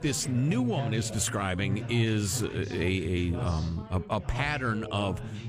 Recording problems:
background chatter; loud; throughout; 3 voices, 7 dB below the speech

